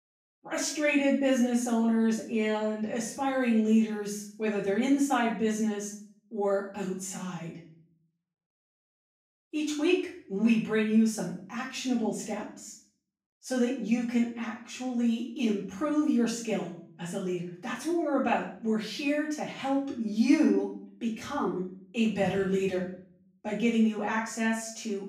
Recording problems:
off-mic speech; far
room echo; noticeable; dies away in 0.5 s

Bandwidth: 15.5 kHz